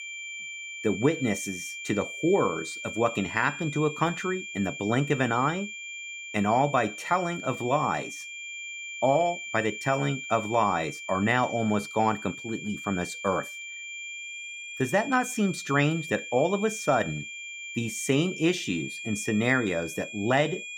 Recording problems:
high-pitched whine; loud; throughout; 2.5 kHz, 9 dB below the speech

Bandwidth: 17 kHz